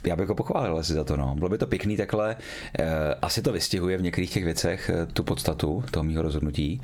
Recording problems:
squashed, flat; somewhat

